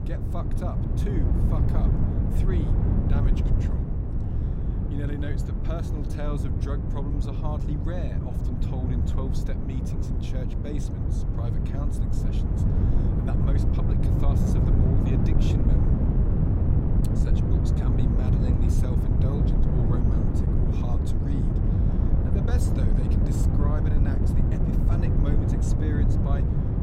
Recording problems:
wind noise on the microphone; heavy; 5 dB above the speech

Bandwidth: 16 kHz